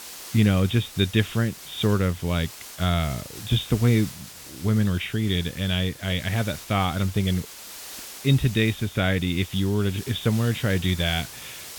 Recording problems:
high frequencies cut off; severe; nothing above 4 kHz
hiss; noticeable; throughout; 15 dB below the speech

